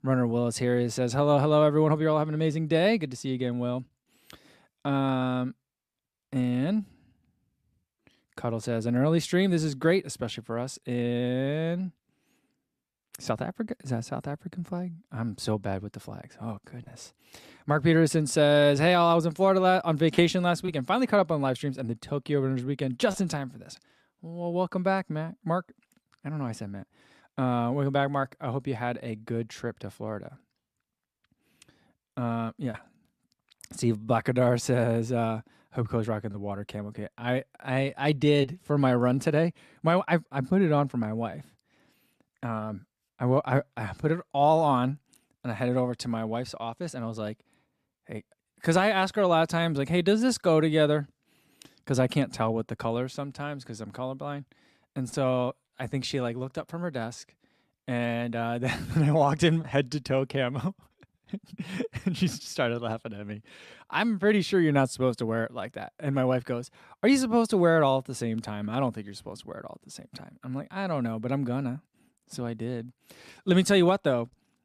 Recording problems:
none

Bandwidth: 14.5 kHz